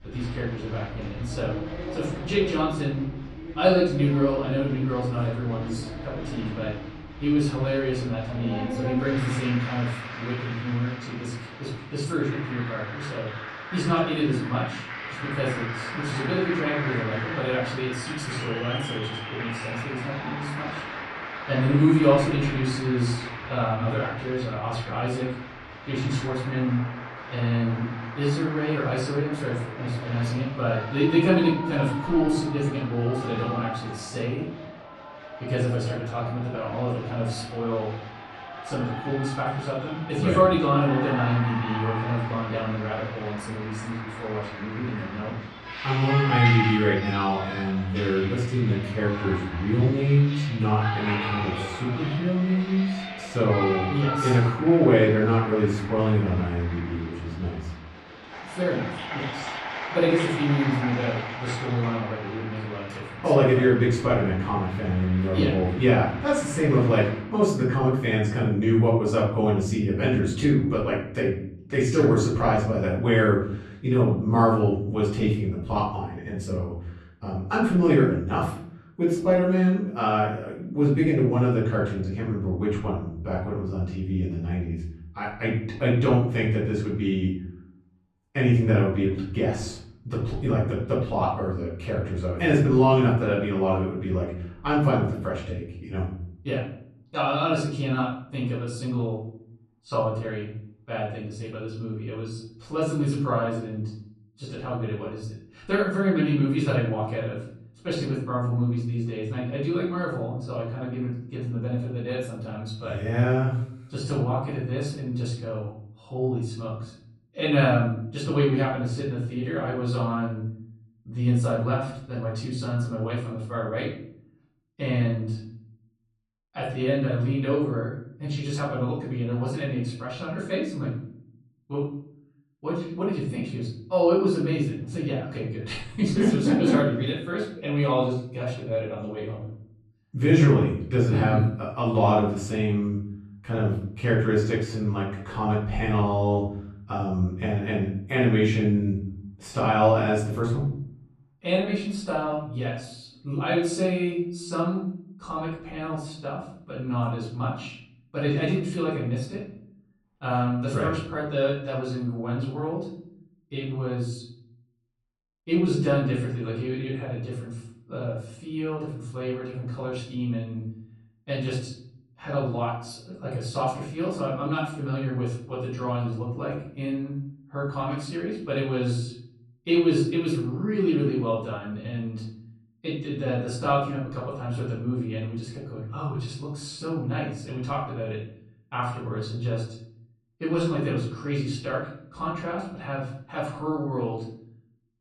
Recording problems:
off-mic speech; far
room echo; noticeable; dies away in 0.7 s
crowd noise; loud; until 1:07; 9 dB below the speech

